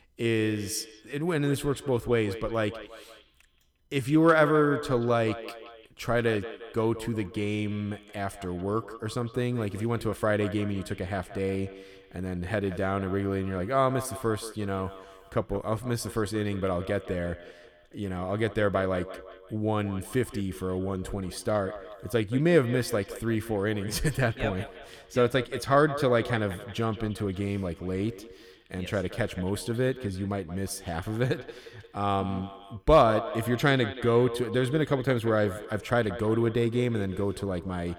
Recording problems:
echo of what is said; noticeable; throughout; 180 ms later, 15 dB below the speech

